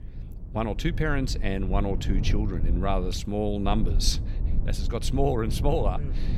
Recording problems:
low rumble; noticeable; throughout; 15 dB below the speech

